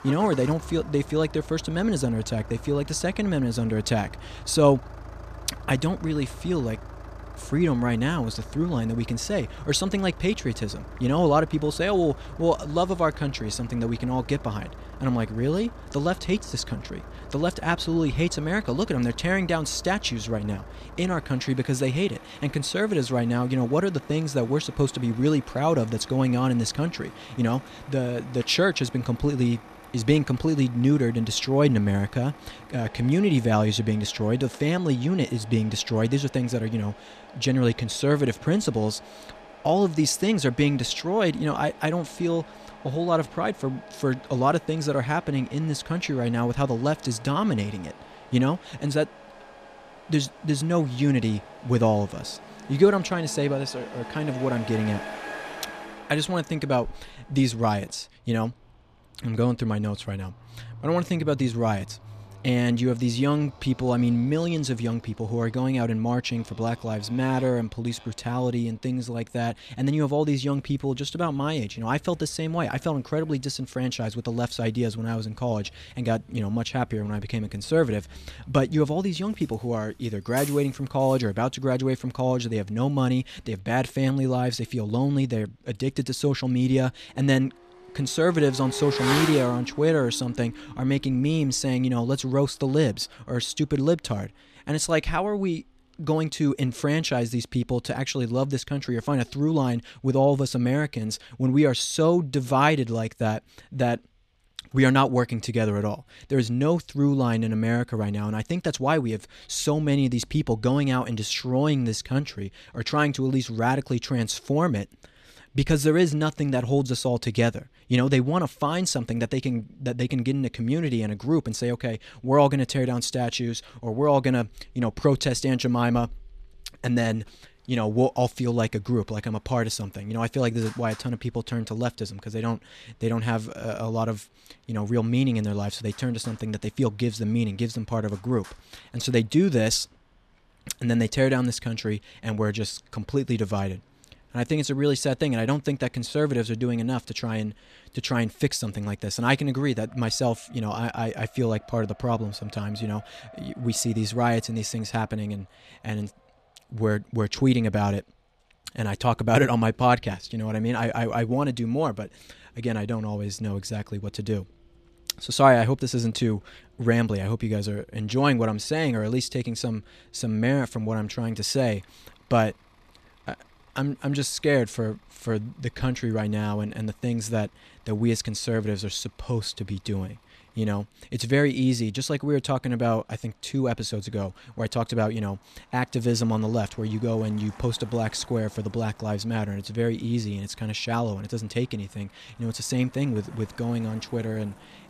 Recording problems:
traffic noise; noticeable; throughout; 15 dB below the speech

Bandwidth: 14.5 kHz